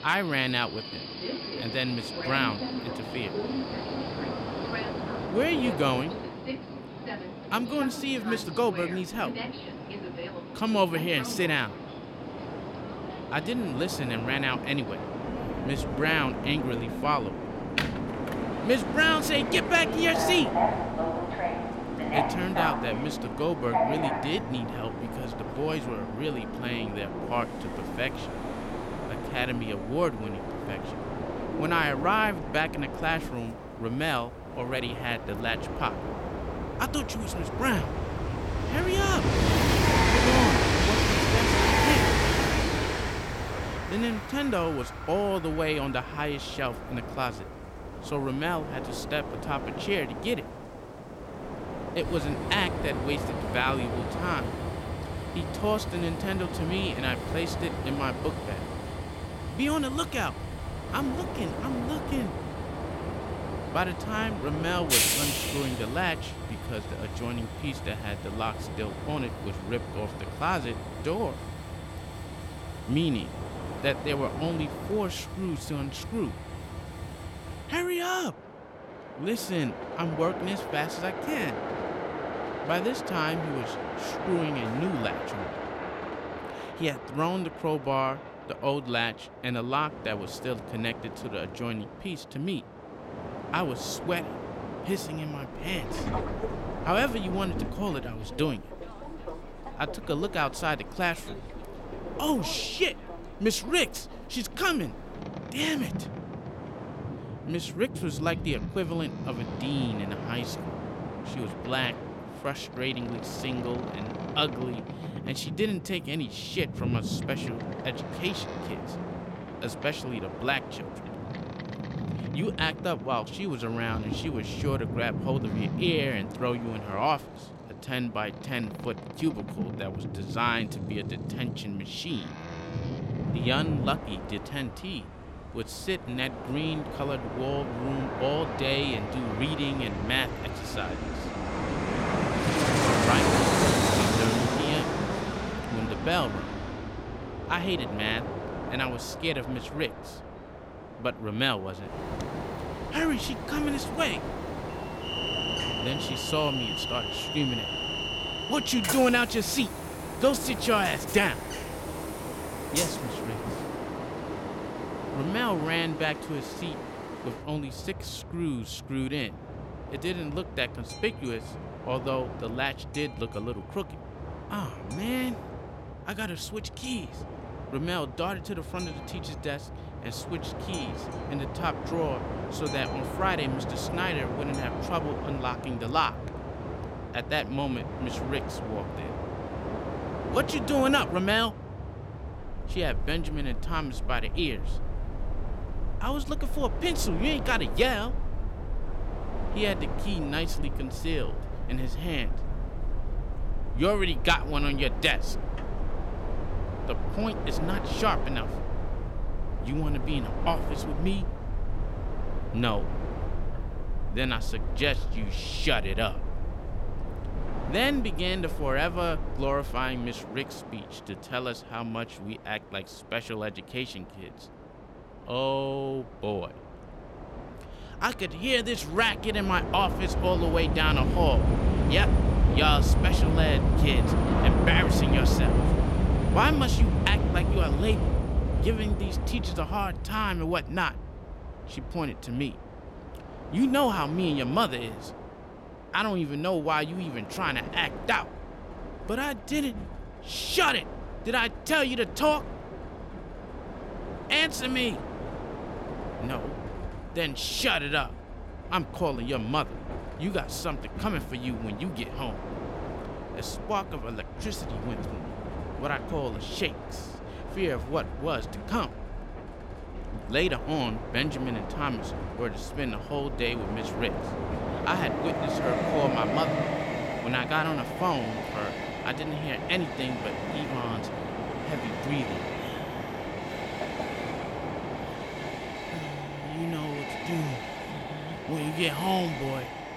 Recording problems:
train or aircraft noise; loud; throughout; 3 dB below the speech

